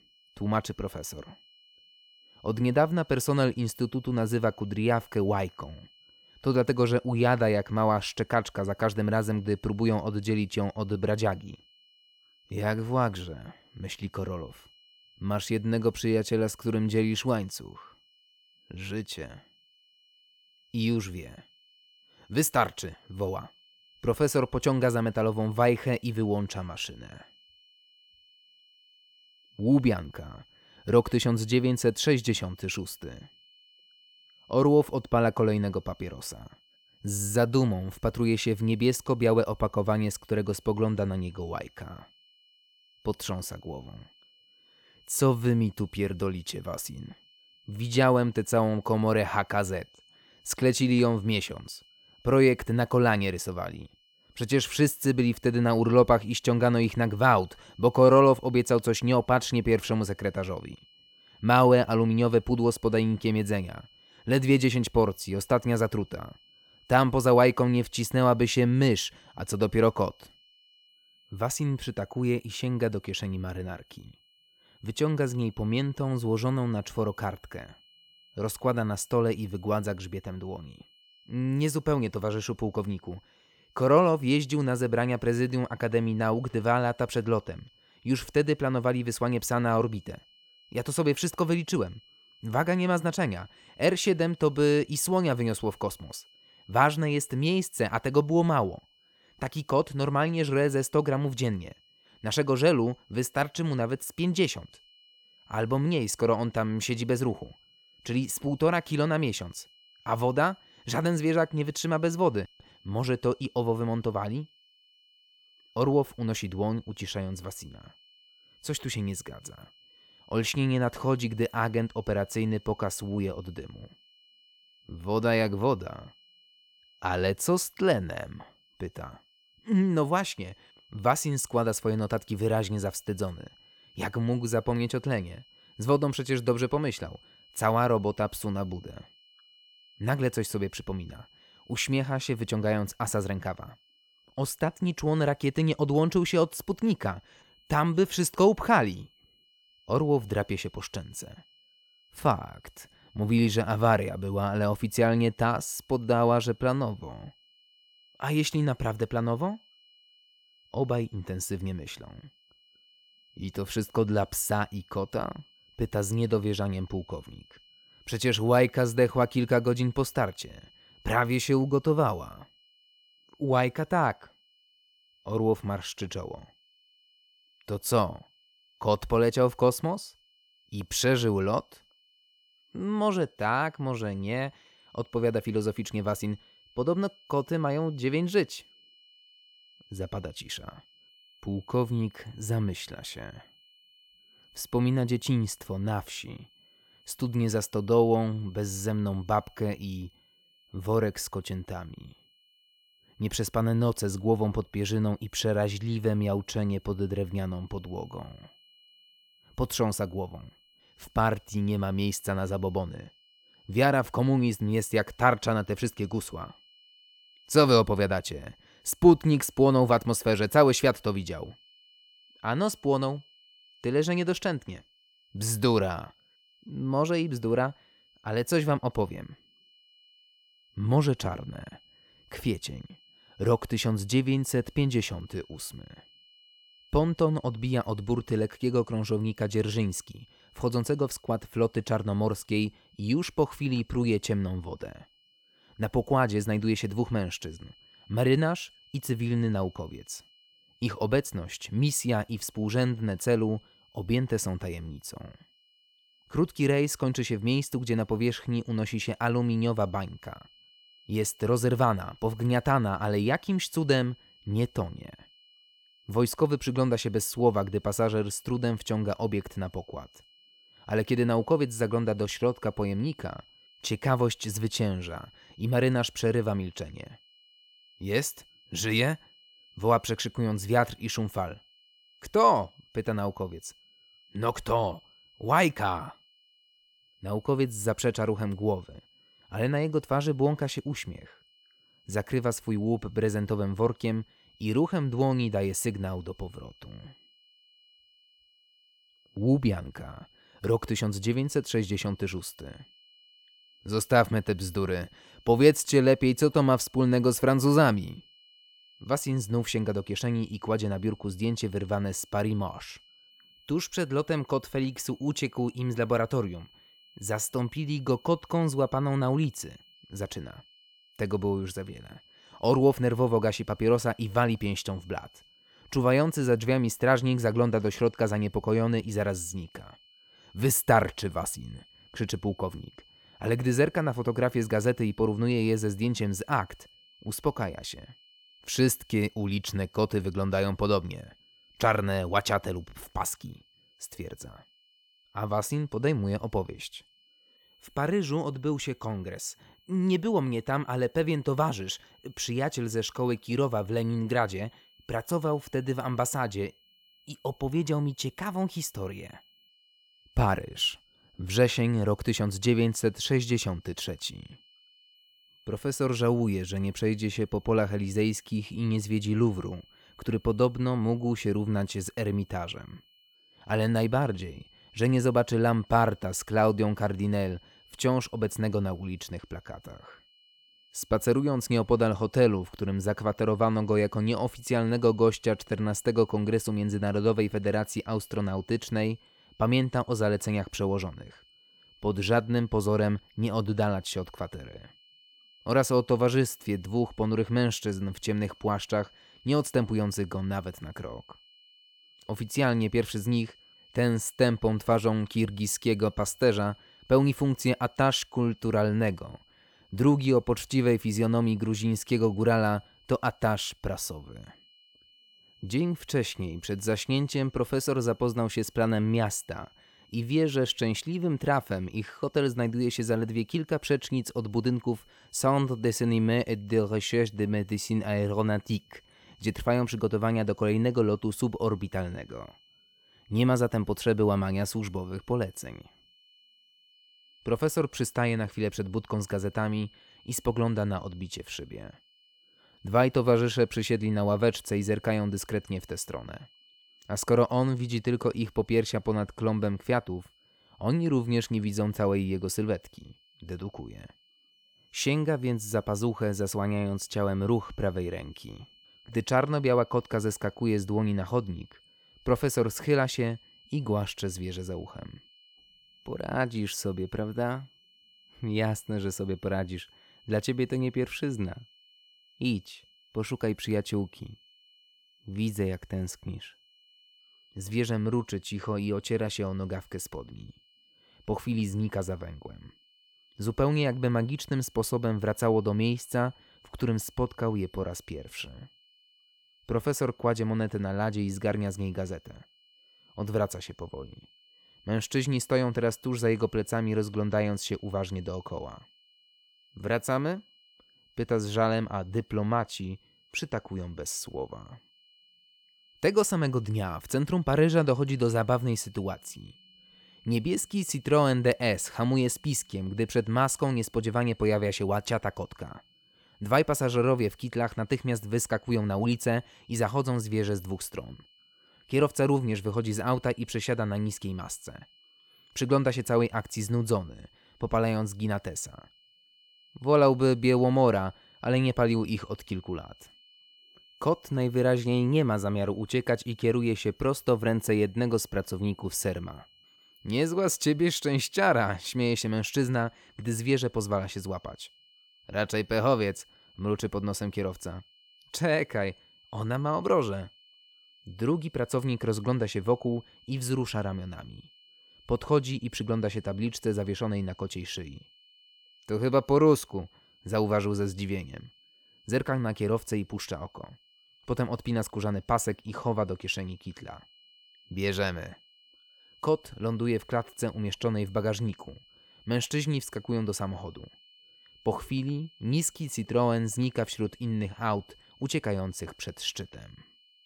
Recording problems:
high-pitched whine; faint; throughout; 3 kHz, 30 dB below the speech

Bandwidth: 18 kHz